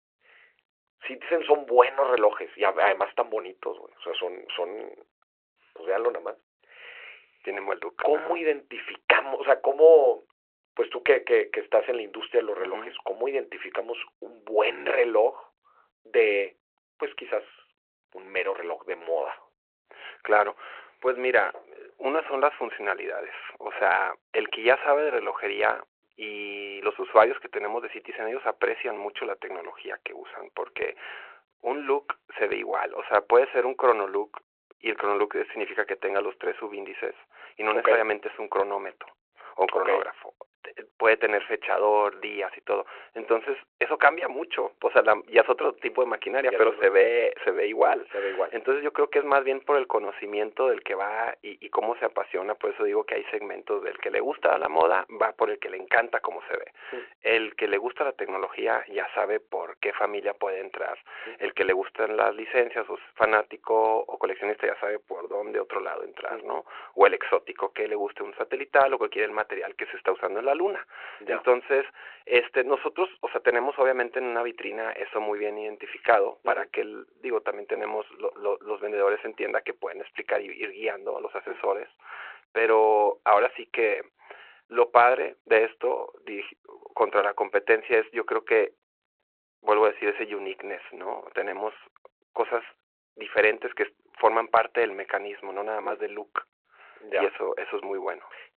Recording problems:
phone-call audio

